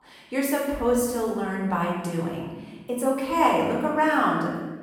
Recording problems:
off-mic speech; far
room echo; noticeable; dies away in 1.1 s

